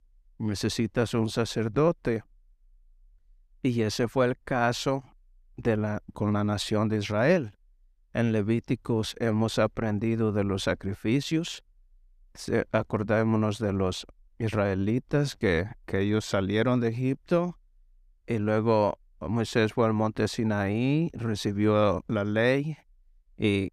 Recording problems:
none

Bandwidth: 14.5 kHz